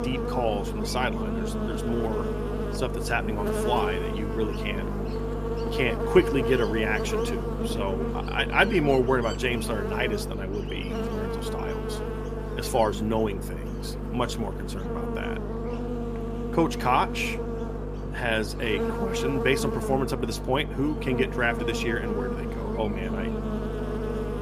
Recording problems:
electrical hum; loud; throughout; 50 Hz, 6 dB below the speech

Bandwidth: 14.5 kHz